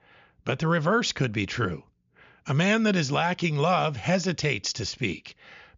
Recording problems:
high frequencies cut off; noticeable; nothing above 7 kHz

